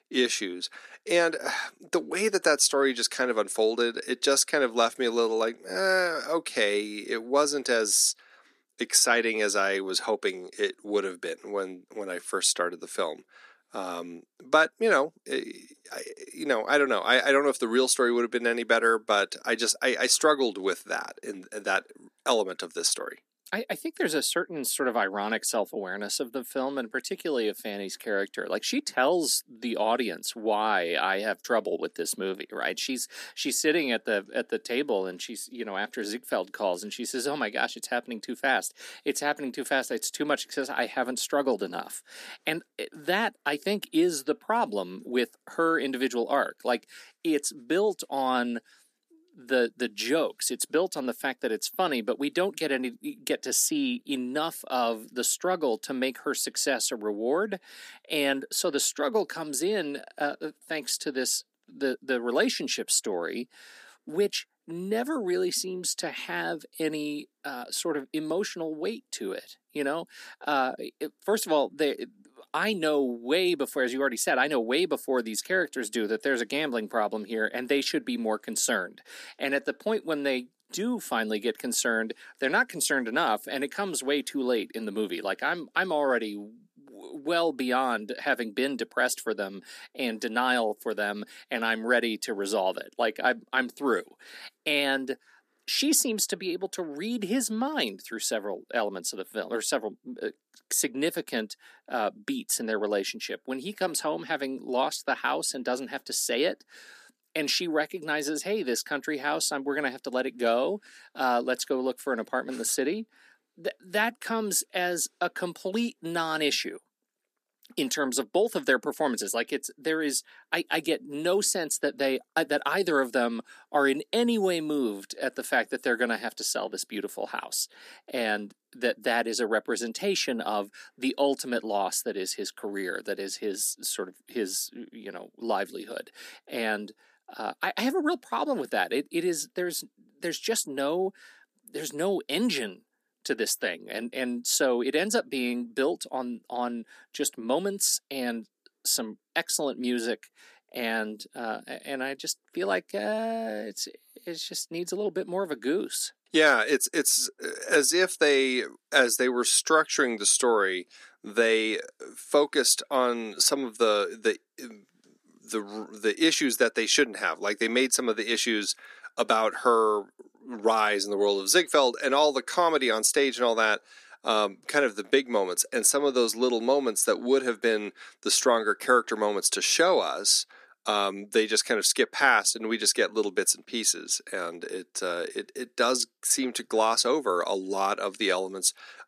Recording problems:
thin; somewhat; fading below 250 Hz

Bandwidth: 14.5 kHz